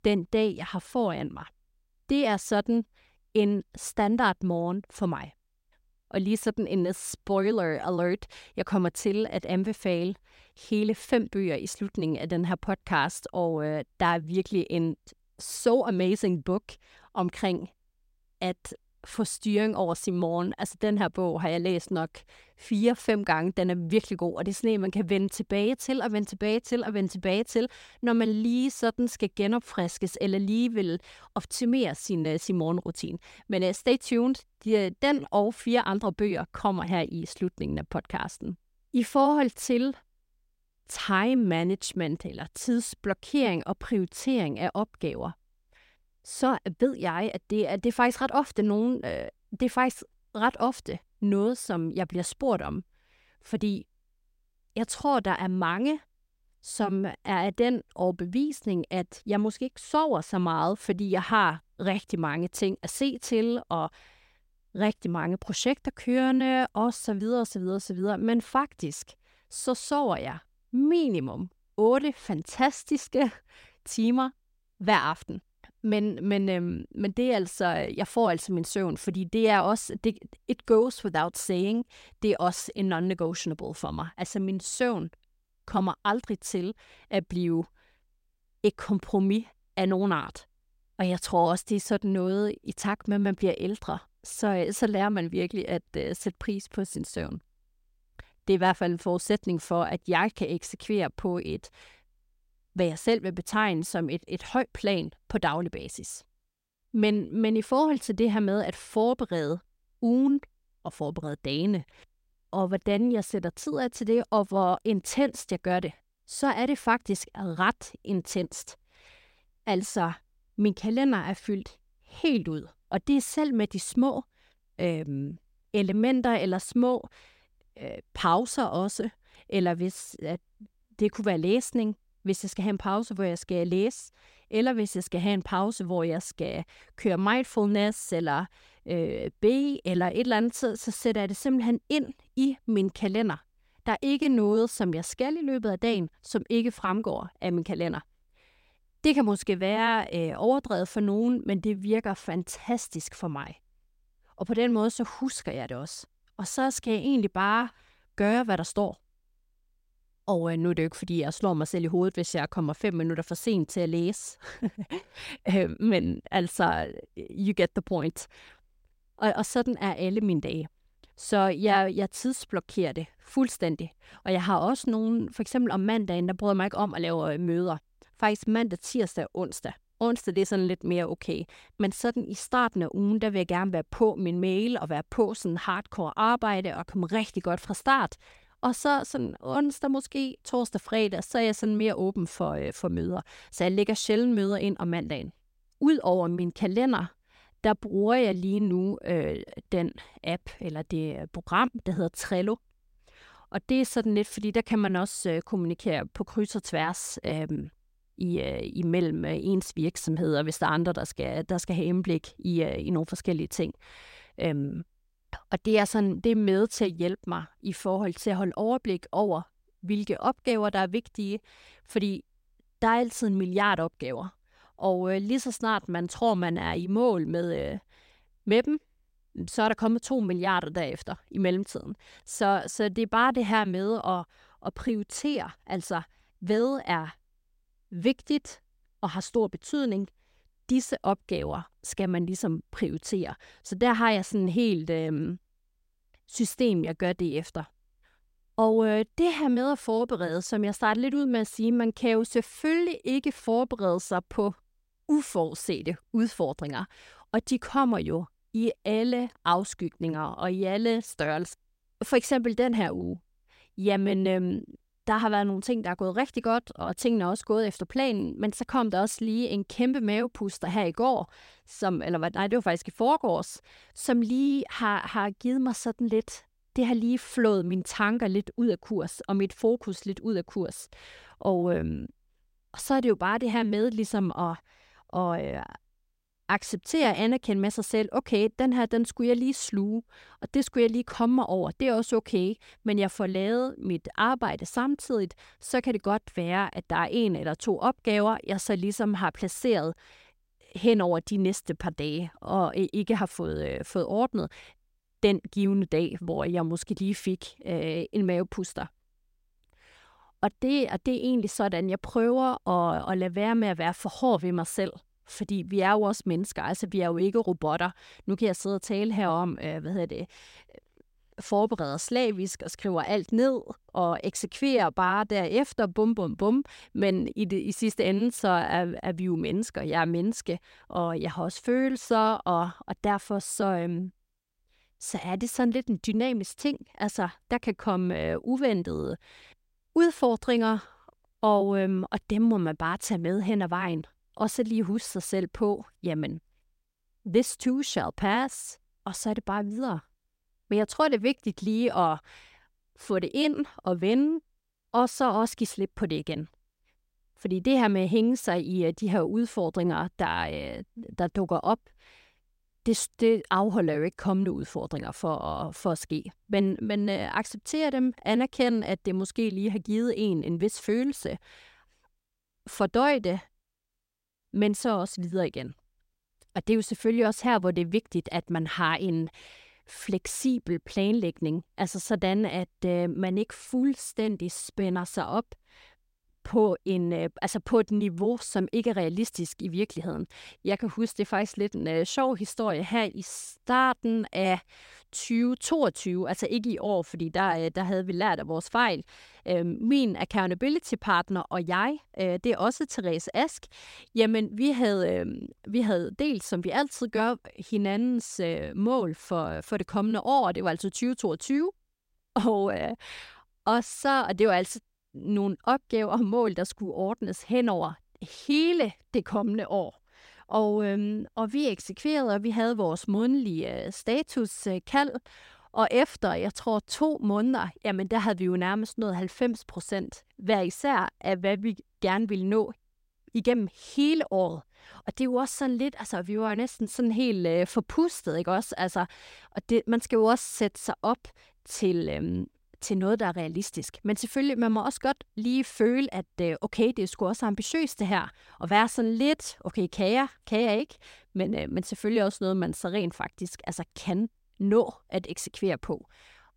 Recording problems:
none

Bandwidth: 16 kHz